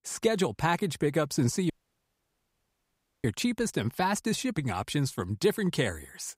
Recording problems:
audio cutting out; at 1.5 s for 1.5 s

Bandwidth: 15.5 kHz